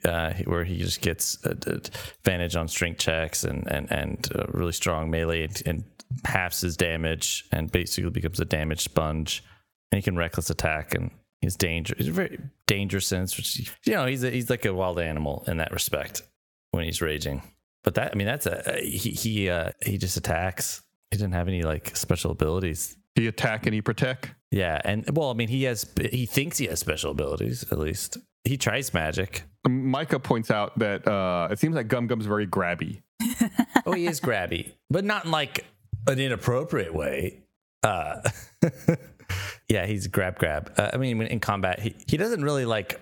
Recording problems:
squashed, flat; heavily

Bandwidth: 18 kHz